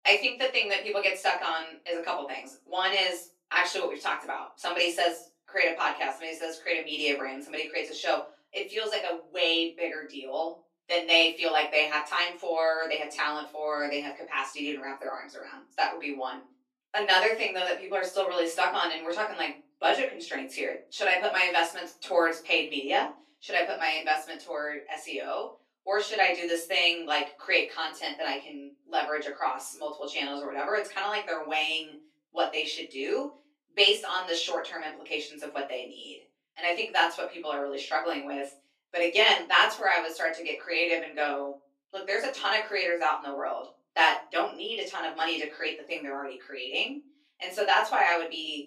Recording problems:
off-mic speech; far
thin; somewhat; fading below 350 Hz
room echo; slight; dies away in 0.3 s

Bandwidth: 15.5 kHz